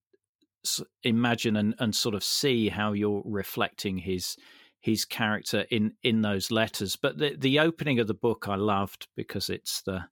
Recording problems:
none

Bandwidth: 17.5 kHz